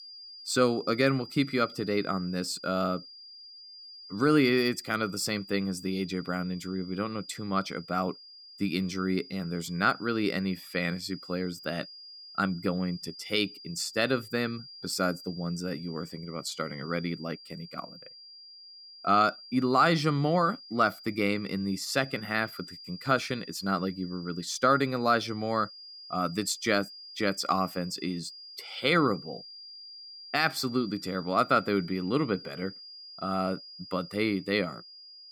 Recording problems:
high-pitched whine; noticeable; throughout; 5 kHz, 15 dB below the speech

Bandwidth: 18.5 kHz